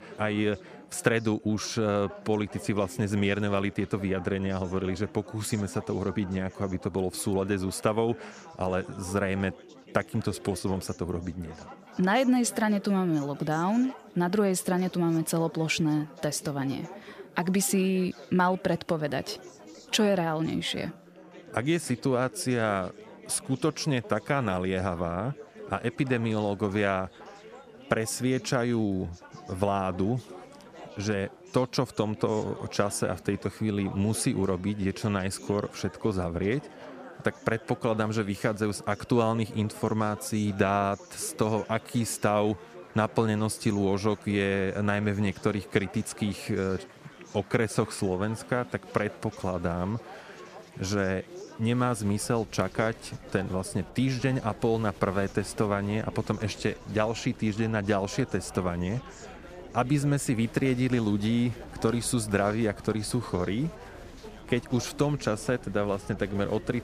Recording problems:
chatter from many people; noticeable; throughout; 20 dB below the speech

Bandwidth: 14.5 kHz